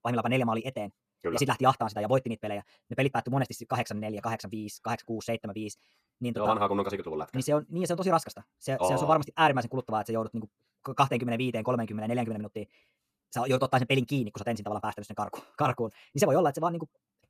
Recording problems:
wrong speed, natural pitch; too fast; 1.8 times normal speed

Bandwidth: 14.5 kHz